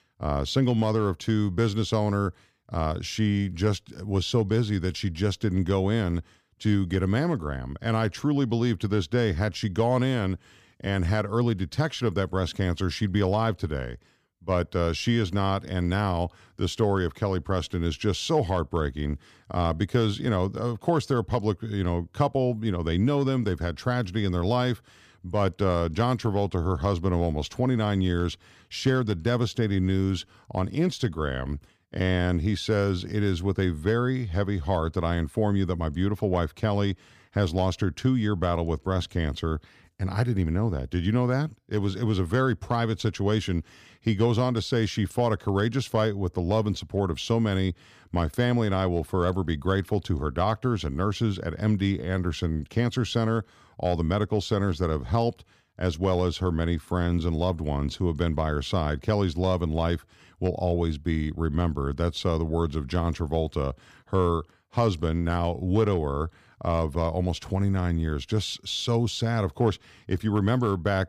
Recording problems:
none

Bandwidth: 15 kHz